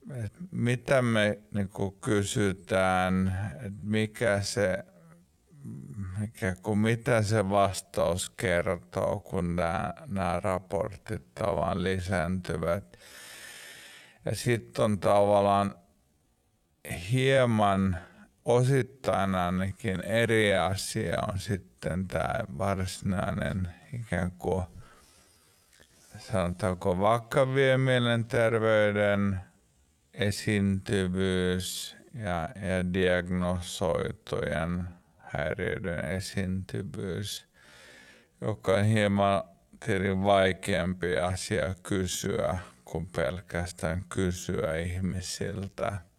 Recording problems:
wrong speed, natural pitch; too slow; 0.5 times normal speed

